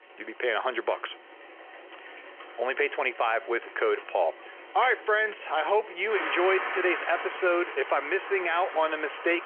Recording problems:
phone-call audio; nothing above 3 kHz
traffic noise; loud; throughout; 10 dB below the speech

